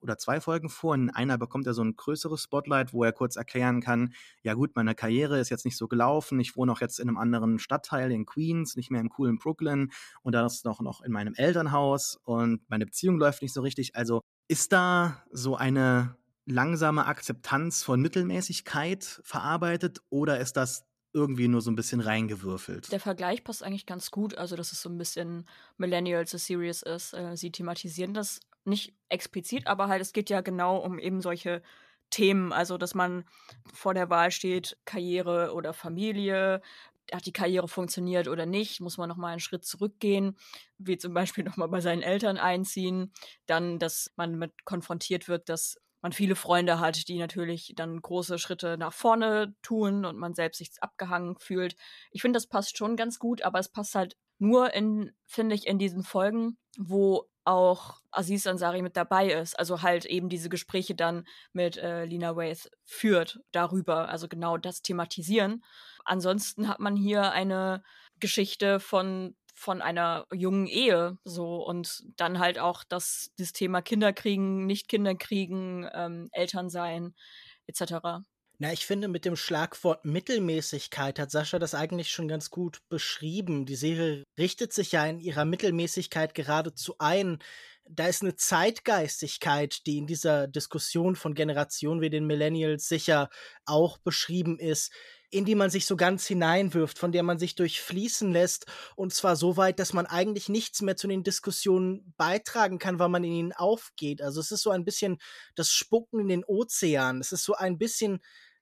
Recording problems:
none

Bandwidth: 14.5 kHz